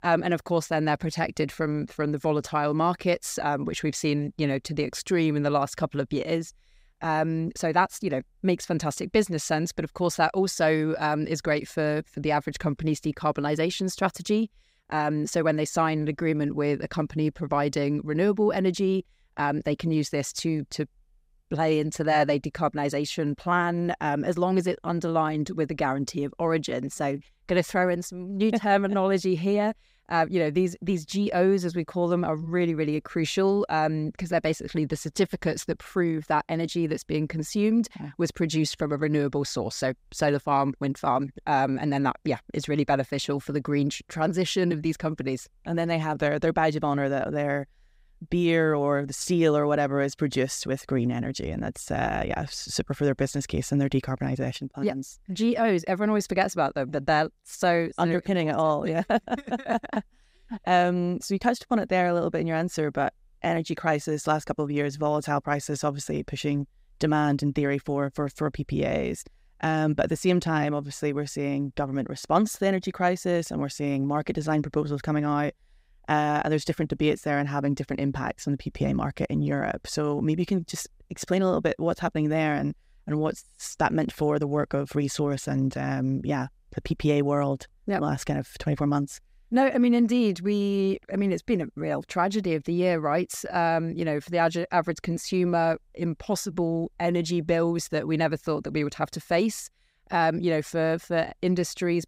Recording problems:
none

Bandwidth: 15.5 kHz